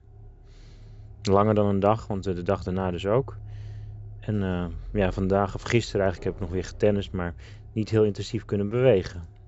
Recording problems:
high frequencies cut off; noticeable; nothing above 7.5 kHz
traffic noise; noticeable; throughout; 20 dB below the speech

